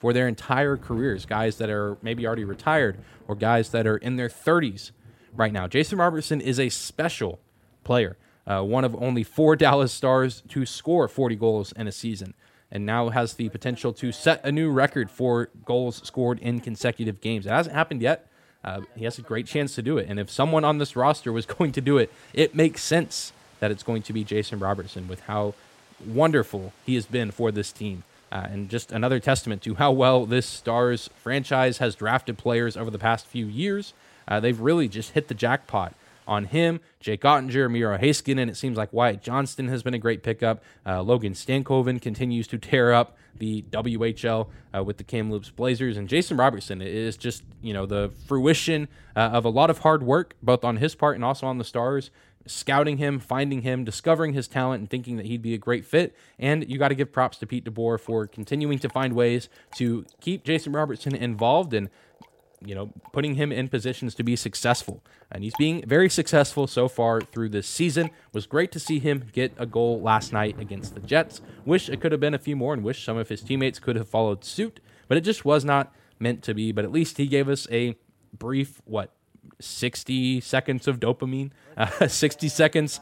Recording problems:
rain or running water; faint; throughout; 25 dB below the speech

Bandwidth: 16 kHz